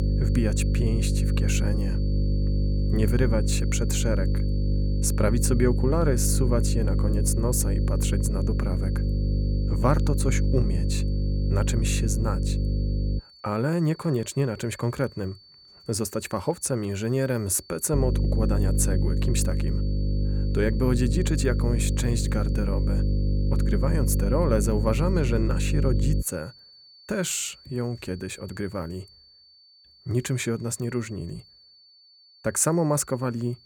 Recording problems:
electrical hum; loud; until 13 s and from 18 to 26 s; 50 Hz, 7 dB below the speech
high-pitched whine; faint; throughout; 4.5 kHz, 20 dB below the speech

